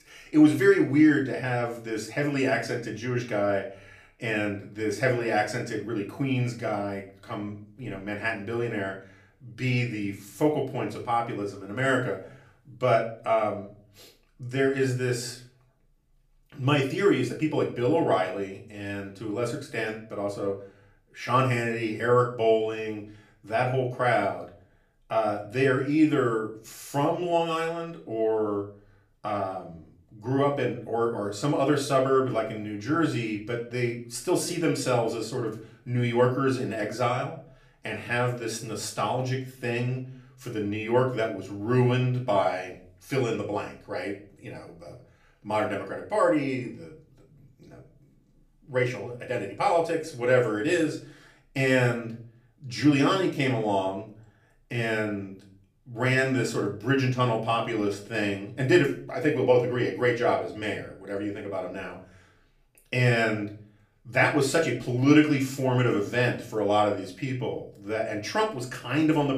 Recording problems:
off-mic speech; far
room echo; slight; dies away in 0.4 s

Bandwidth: 15 kHz